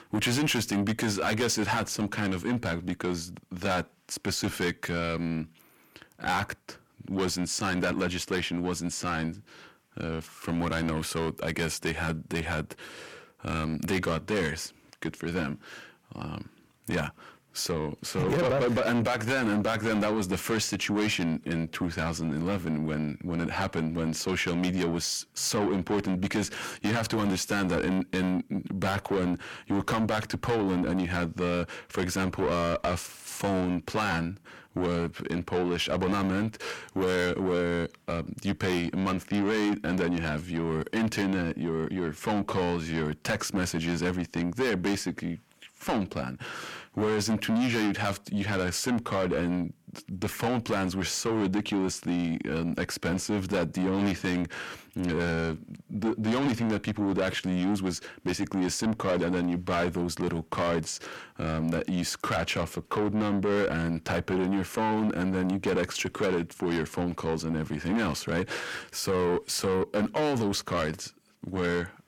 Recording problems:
distortion; heavy; 6 dB below the speech

